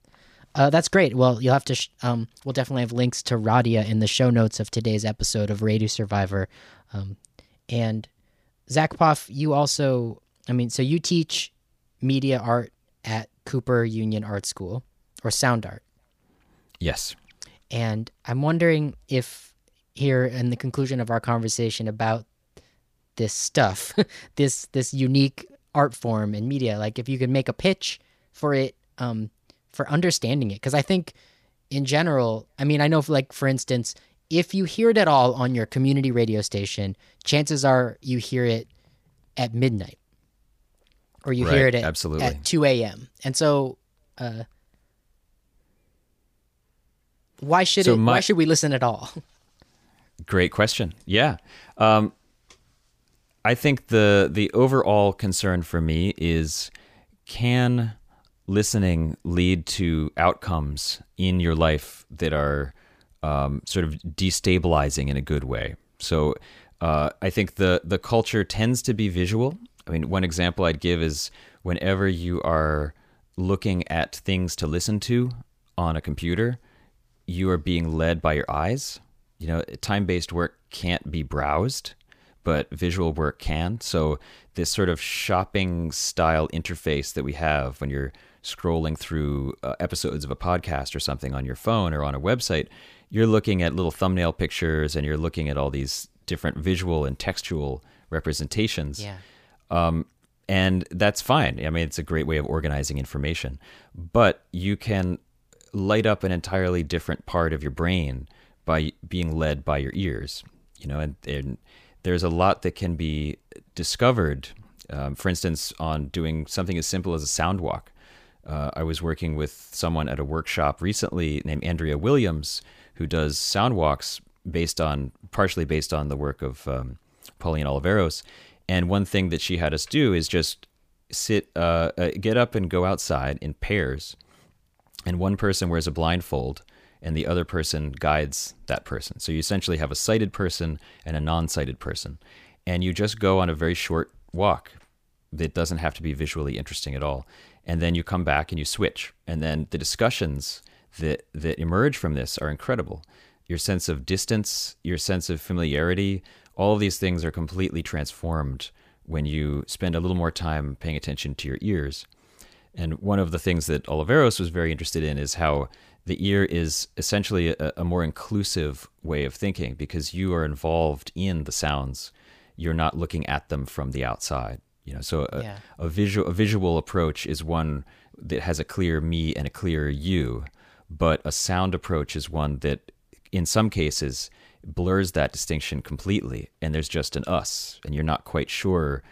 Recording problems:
none

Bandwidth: 15 kHz